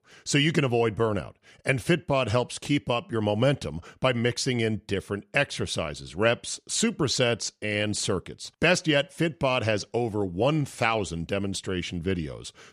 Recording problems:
none

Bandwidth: 14.5 kHz